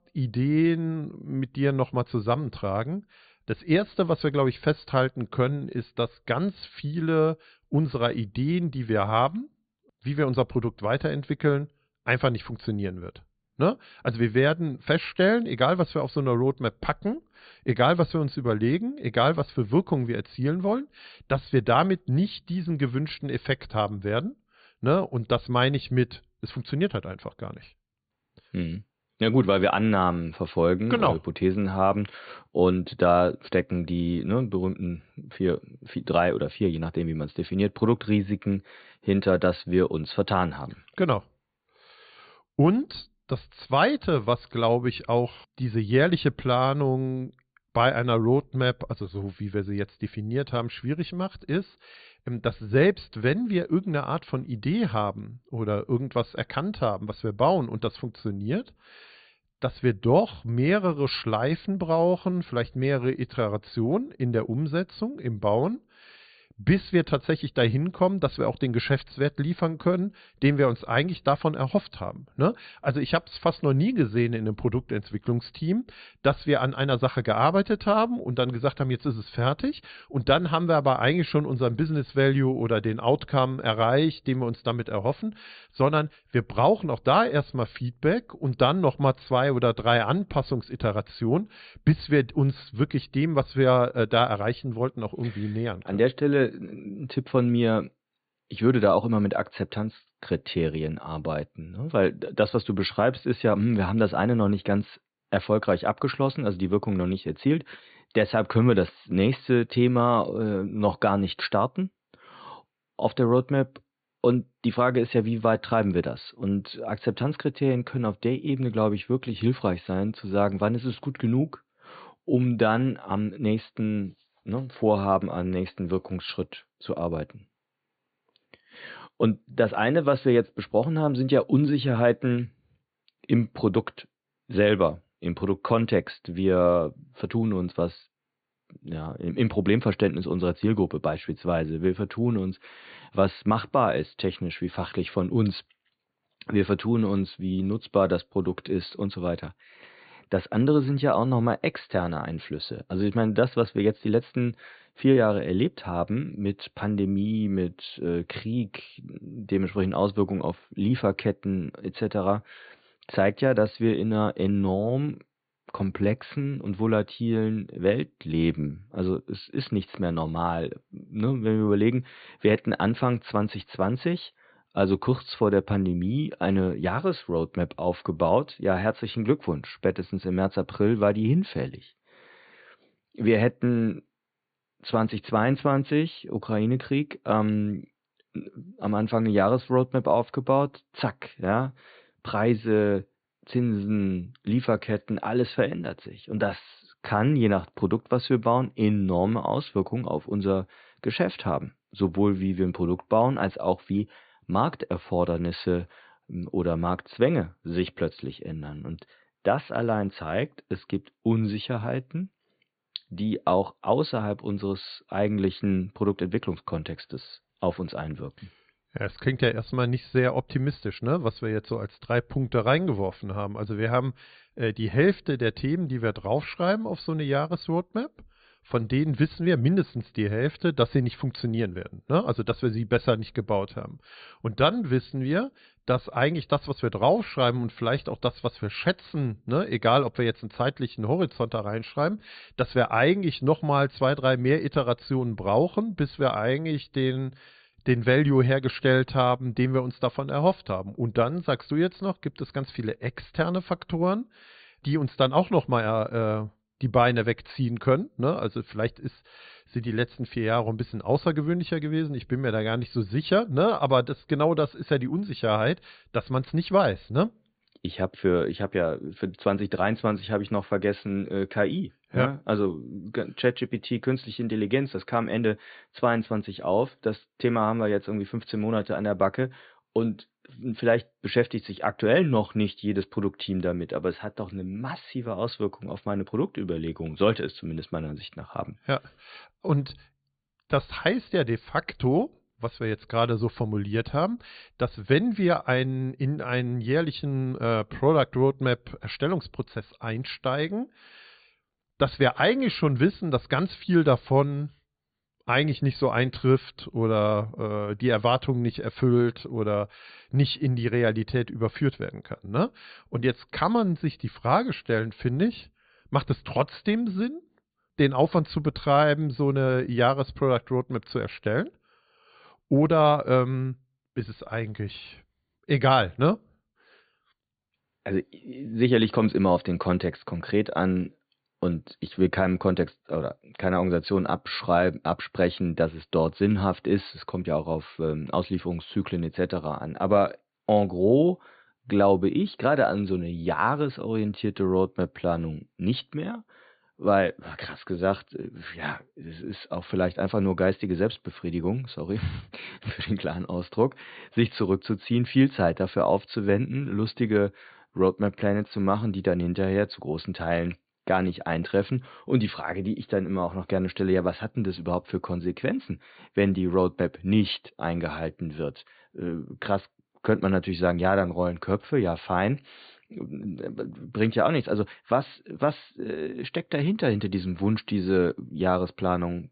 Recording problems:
high frequencies cut off; severe; nothing above 4.5 kHz

